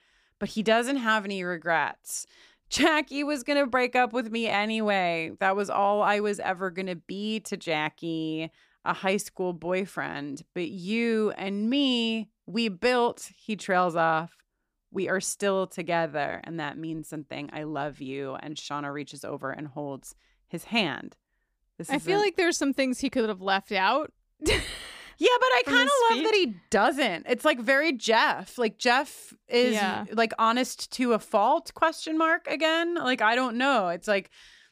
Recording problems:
none

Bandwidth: 15 kHz